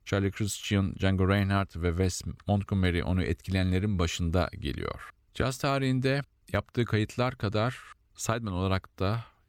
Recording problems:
none

